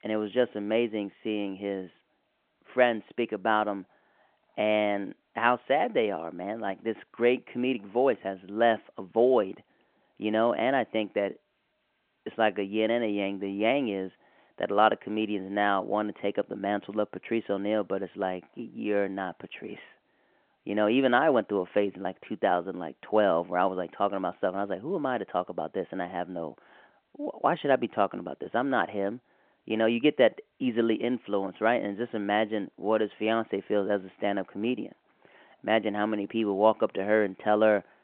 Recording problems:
phone-call audio

